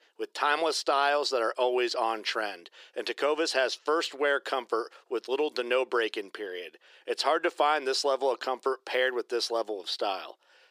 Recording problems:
thin; very; fading below 350 Hz

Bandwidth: 15 kHz